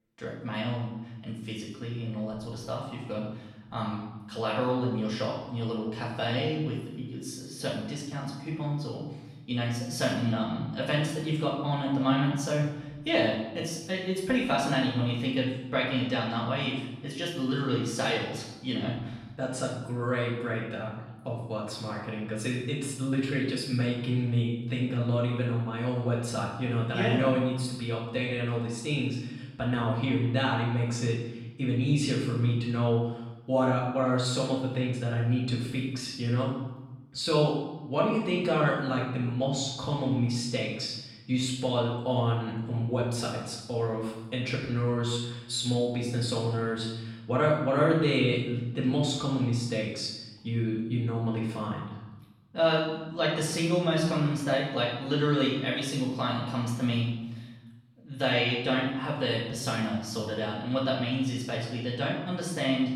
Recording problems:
off-mic speech; far
room echo; noticeable; dies away in 0.9 s

